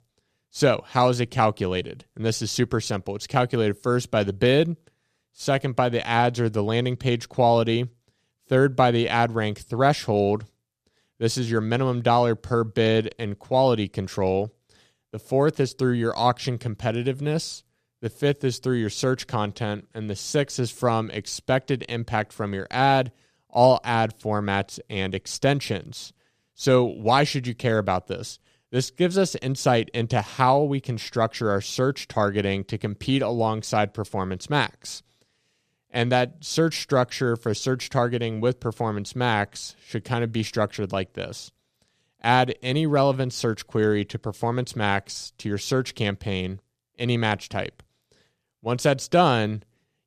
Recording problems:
none

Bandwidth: 14.5 kHz